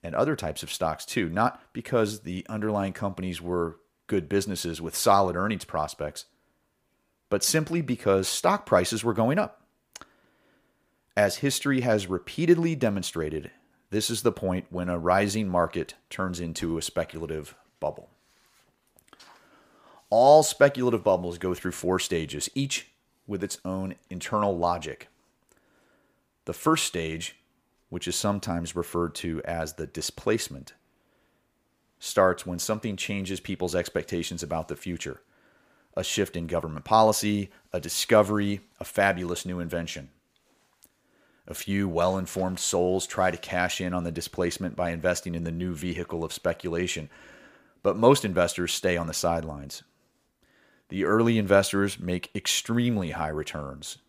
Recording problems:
none

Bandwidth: 15 kHz